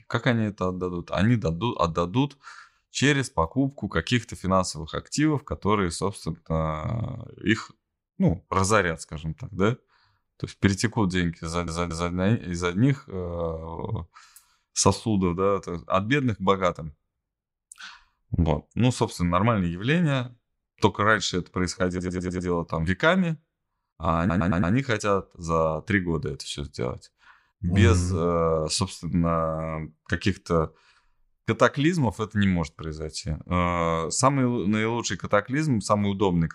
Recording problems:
audio stuttering; at 11 s, at 22 s and at 24 s

